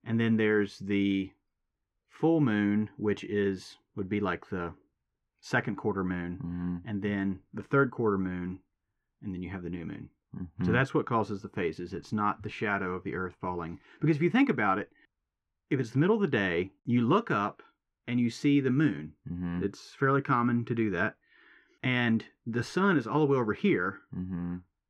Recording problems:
muffled; very; fading above 2 kHz

